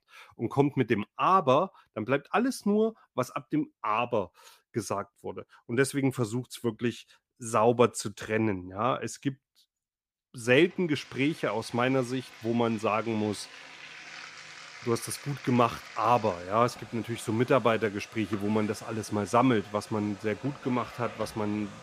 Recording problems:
household noises; noticeable; from 10 s on; 15 dB below the speech

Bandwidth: 15 kHz